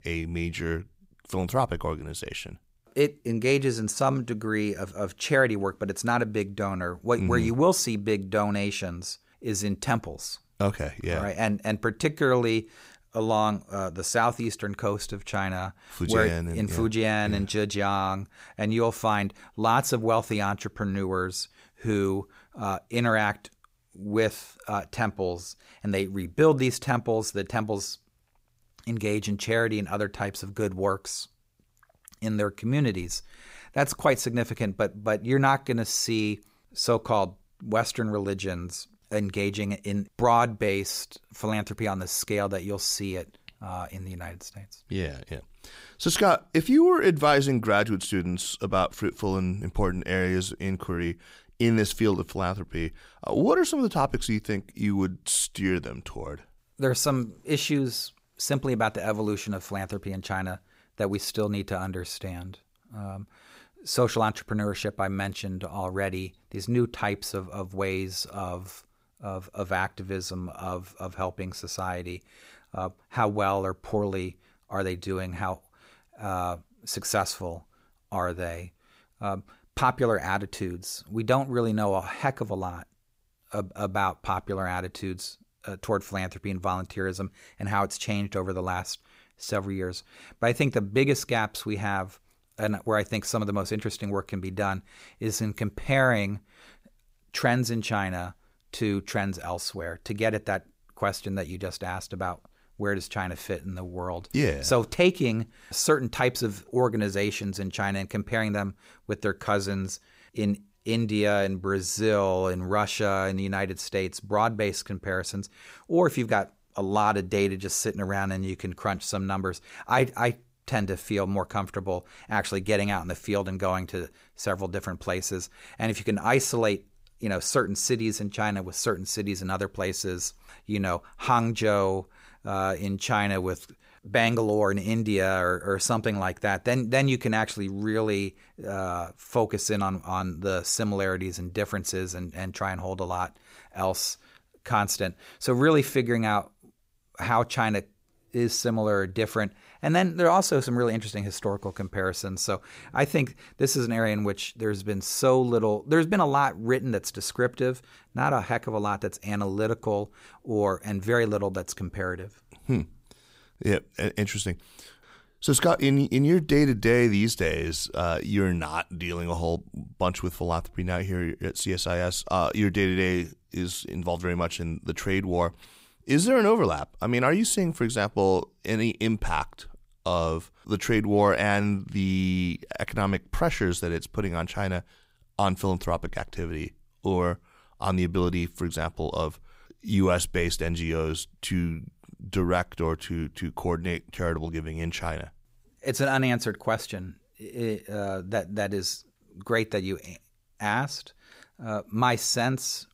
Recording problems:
none

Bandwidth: 15.5 kHz